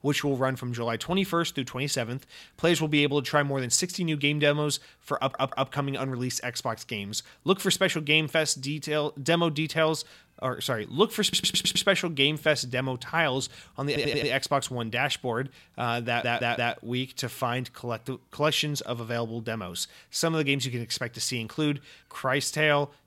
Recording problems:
audio stuttering; 4 times, first at 5 s

